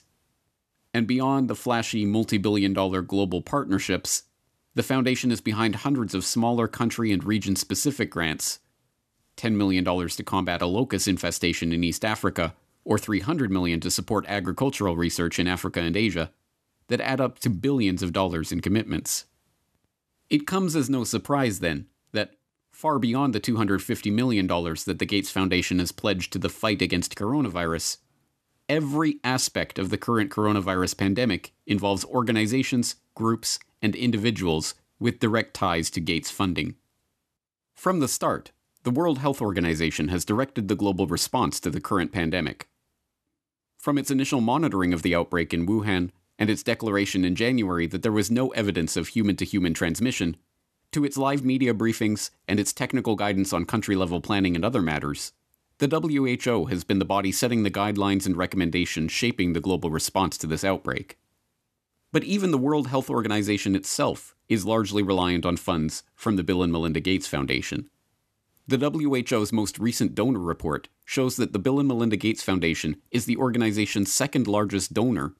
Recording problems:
none

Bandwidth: 13.5 kHz